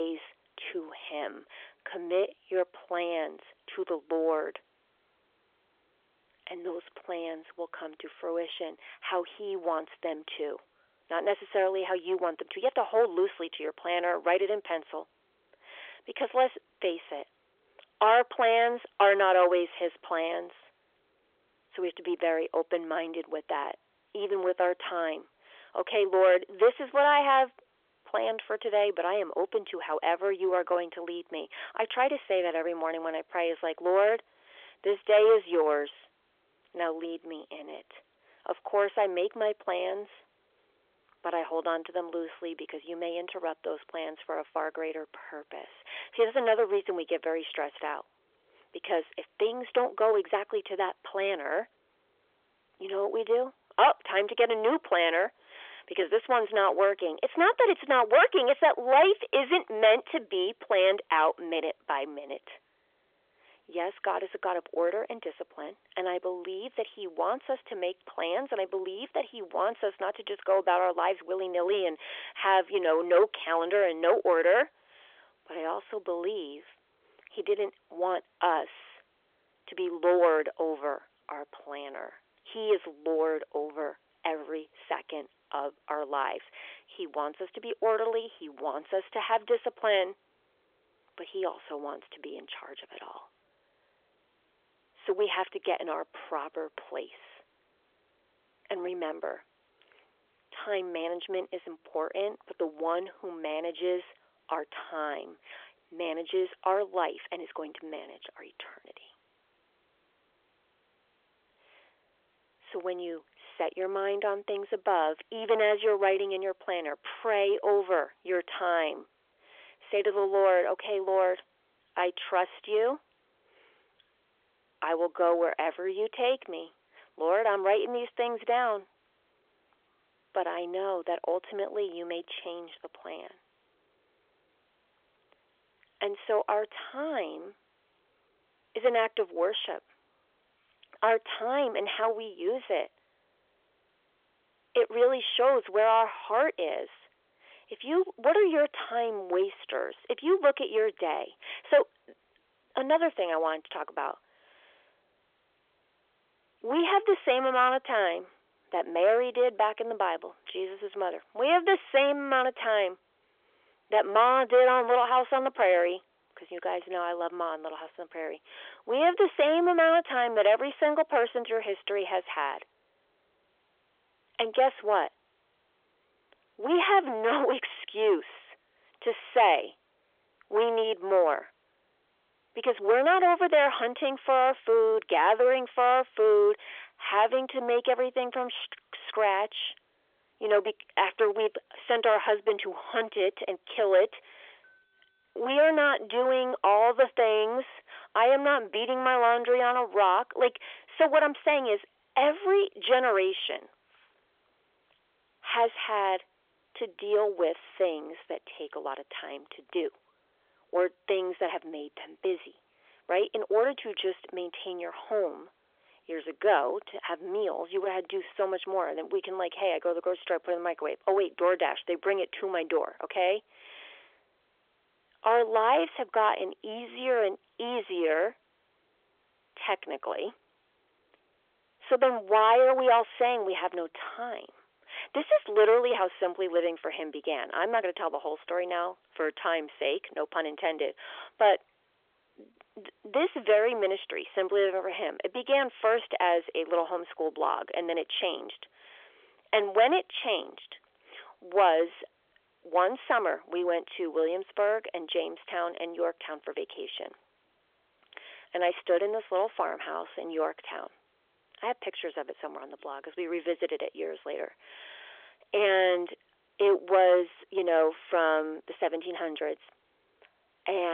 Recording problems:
phone-call audio; nothing above 3.5 kHz
distortion; slight; 10 dB below the speech
abrupt cut into speech; at the start and the end

